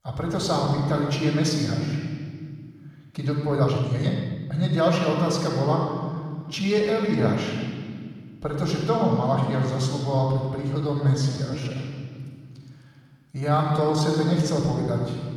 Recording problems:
off-mic speech; far
room echo; noticeable; dies away in 1.8 s
uneven, jittery; strongly; from 3.5 to 14 s

